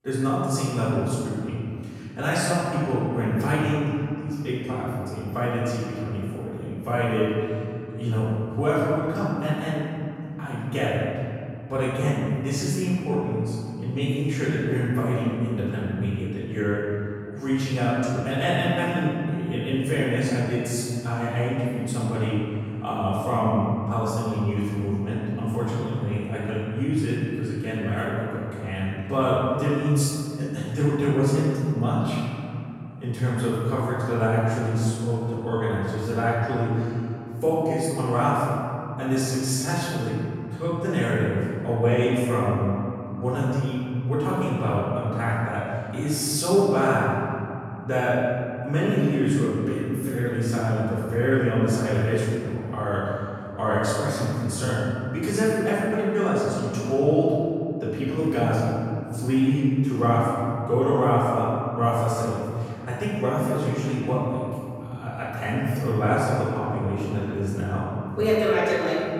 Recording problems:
room echo; strong; dies away in 2.6 s
off-mic speech; far

